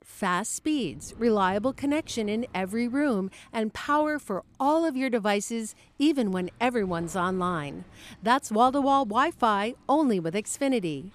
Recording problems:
animal sounds; faint; throughout; 25 dB below the speech

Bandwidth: 14.5 kHz